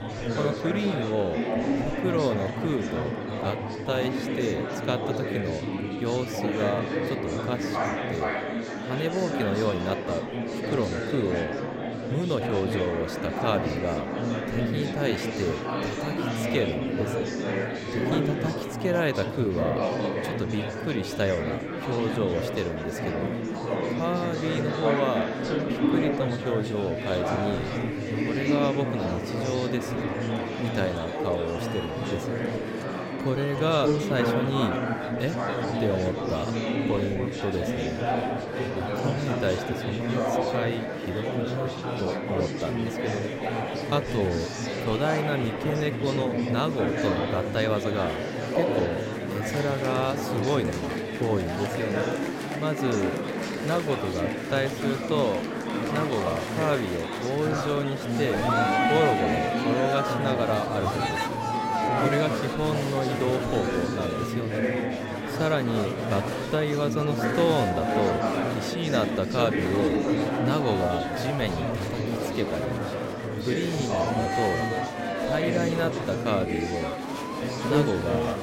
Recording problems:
murmuring crowd; very loud; throughout; 1 dB above the speech

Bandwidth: 16 kHz